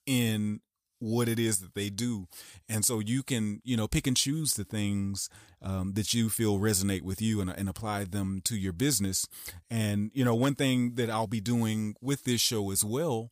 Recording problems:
none

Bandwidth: 15 kHz